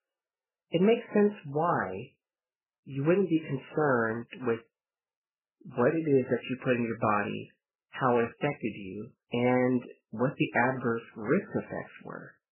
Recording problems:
garbled, watery; badly; nothing above 3 kHz

